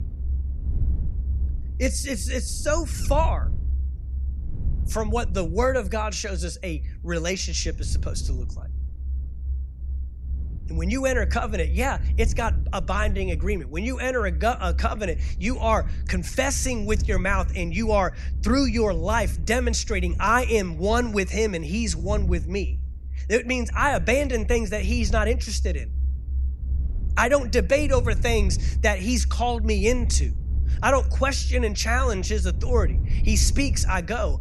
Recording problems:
low rumble; faint; throughout; 20 dB below the speech

